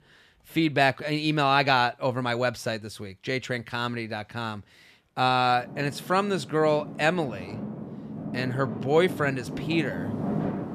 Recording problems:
traffic noise; loud; throughout; 9 dB below the speech

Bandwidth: 14.5 kHz